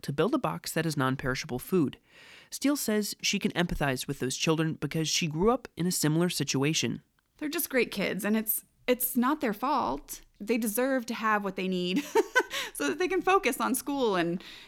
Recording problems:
none

